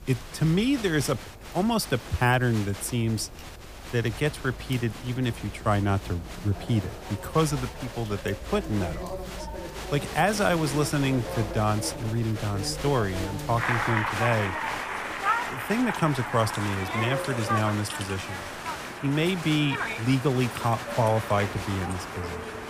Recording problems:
crowd noise; loud; throughout; 7 dB below the speech
train or aircraft noise; noticeable; throughout; 15 dB below the speech

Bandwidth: 15 kHz